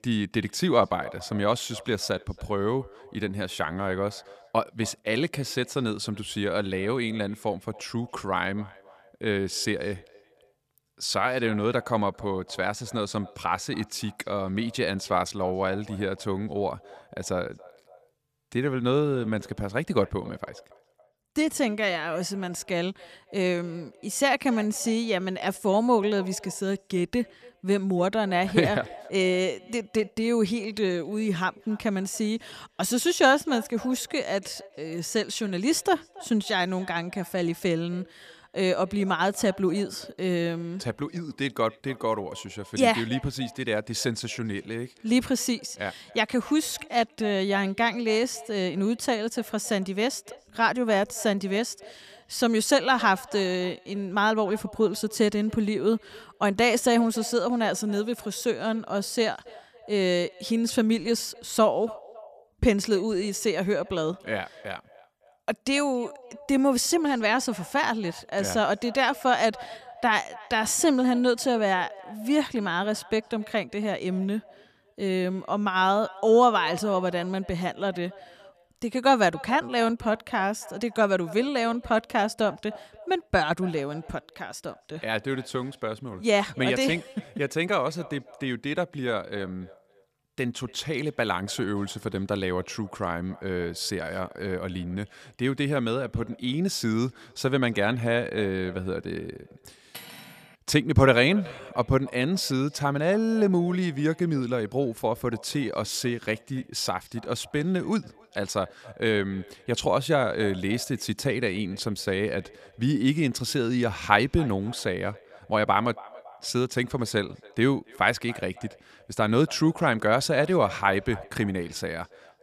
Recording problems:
echo of what is said; faint; throughout; 280 ms later, 20 dB below the speech
clattering dishes; faint; at 1:40; peak 15 dB below the speech

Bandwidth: 14.5 kHz